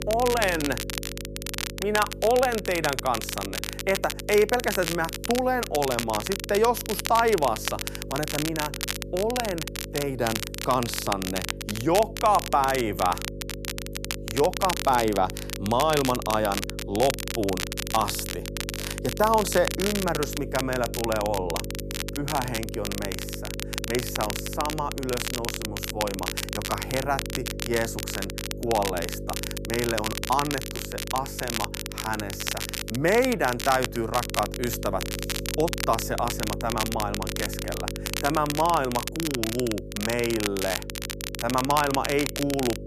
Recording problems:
crackle, like an old record; loud; 5 dB below the speech
electrical hum; noticeable; throughout; 50 Hz, 15 dB below the speech

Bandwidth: 14.5 kHz